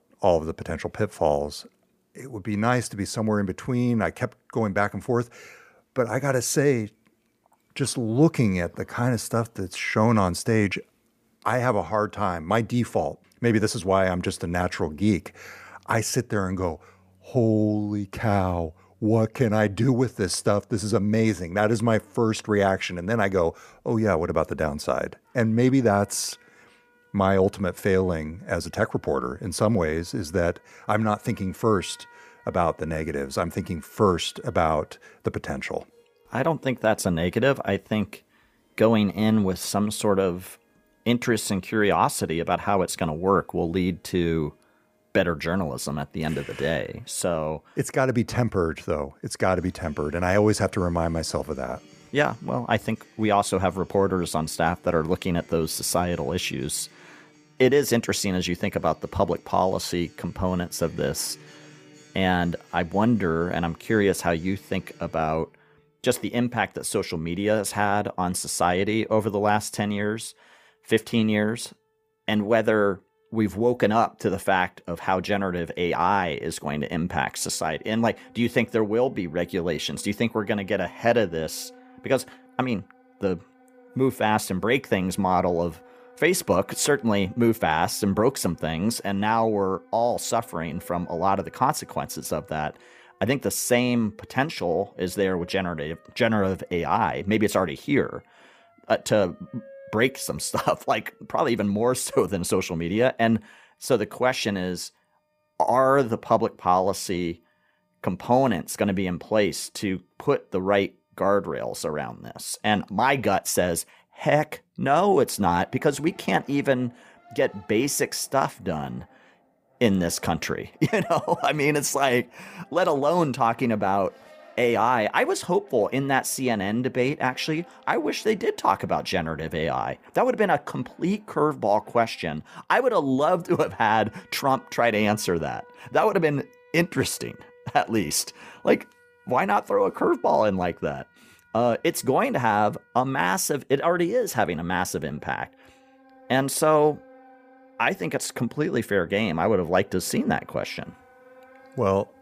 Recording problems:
background music; faint; throughout; 30 dB below the speech

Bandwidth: 15 kHz